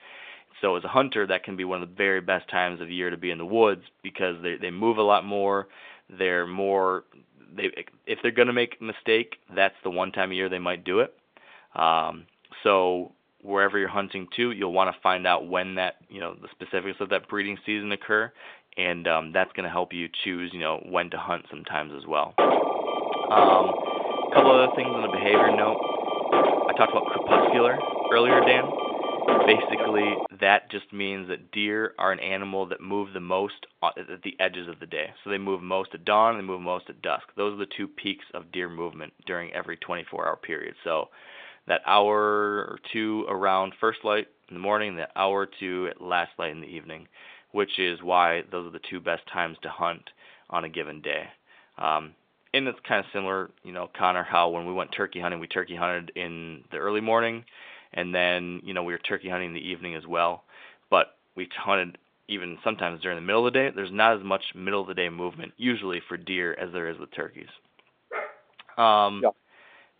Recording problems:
phone-call audio
alarm; loud; from 22 to 30 s; peak 6 dB above the speech
dog barking; noticeable; at 1:08; peak 9 dB below the speech

